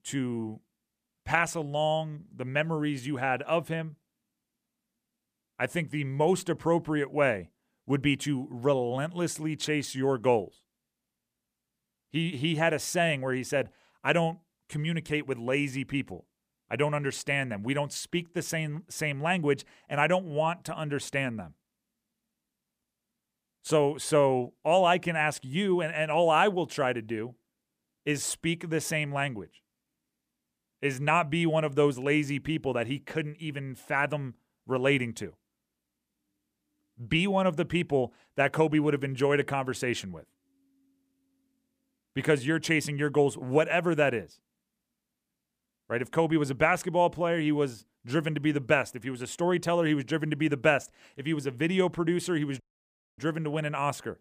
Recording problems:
audio cutting out; at 53 s for 0.5 s

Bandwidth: 15 kHz